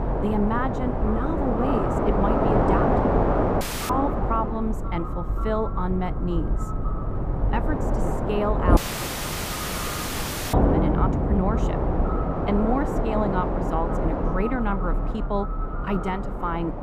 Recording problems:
muffled; very; fading above 2 kHz
echo of what is said; noticeable; throughout; 530 ms later, 15 dB below the speech
train or aircraft noise; very loud; throughout; 3 dB above the speech
audio cutting out; at 3.5 s and at 9 s for 2 s

